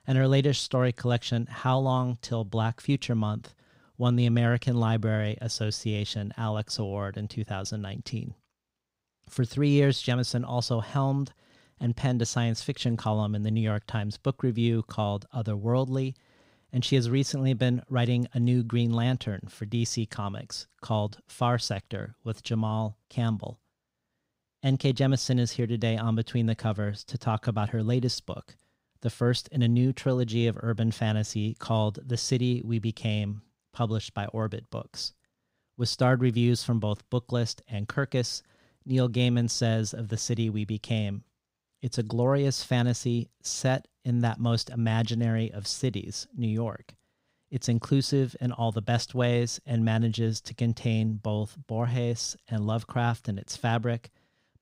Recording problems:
none

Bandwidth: 15.5 kHz